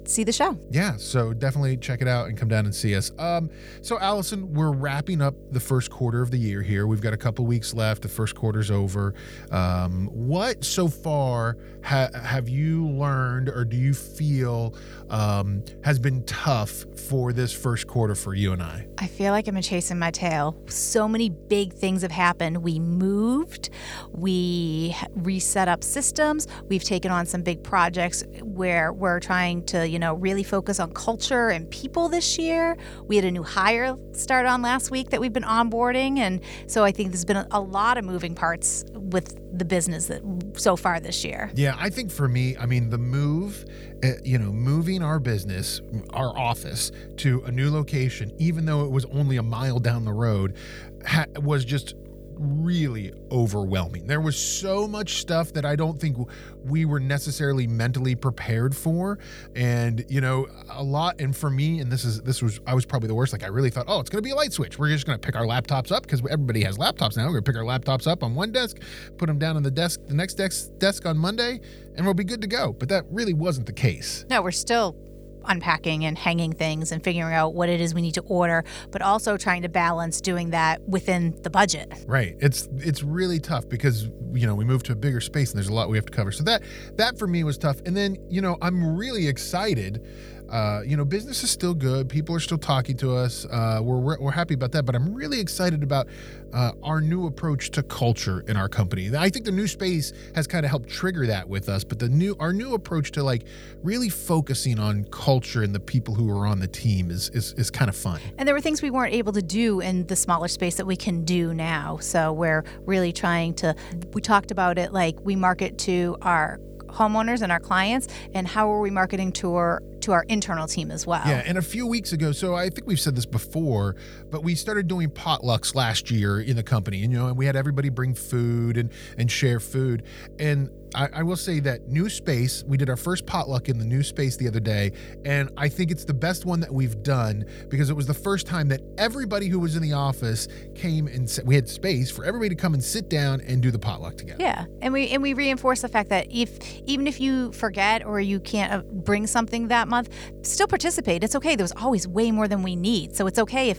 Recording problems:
electrical hum; faint; throughout; 50 Hz, 20 dB below the speech

